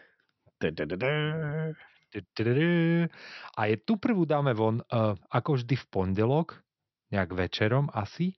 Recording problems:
high frequencies cut off; noticeable; nothing above 6 kHz

